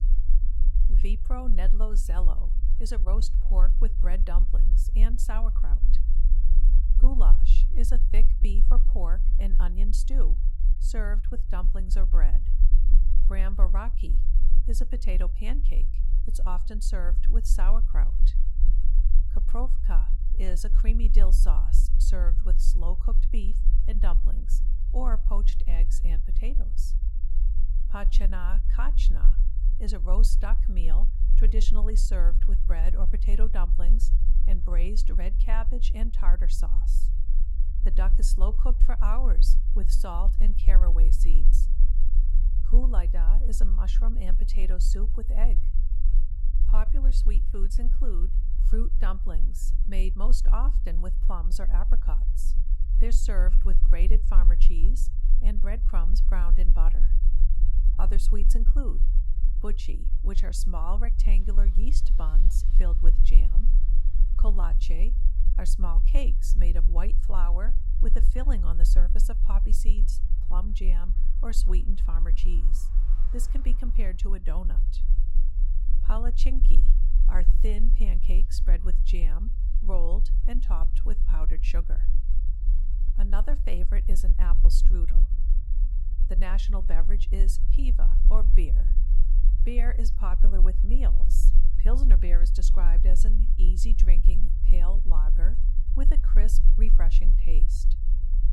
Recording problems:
low rumble; noticeable; throughout; 10 dB below the speech
traffic noise; faint; from 1:00 on; 30 dB below the speech

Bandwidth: 18 kHz